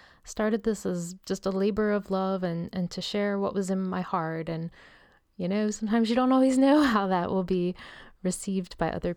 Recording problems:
none

